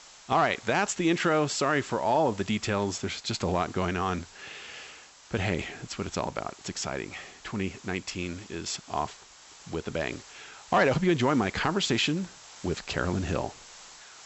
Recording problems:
high frequencies cut off; noticeable; nothing above 8 kHz
hiss; noticeable; throughout; 20 dB below the speech

